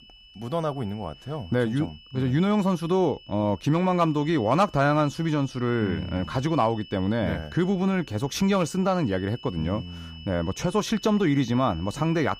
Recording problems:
high-pitched whine; faint; throughout; 3 kHz, 20 dB below the speech

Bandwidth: 15 kHz